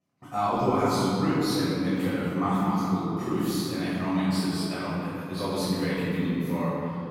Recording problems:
room echo; strong; dies away in 2.7 s
off-mic speech; far

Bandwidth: 16.5 kHz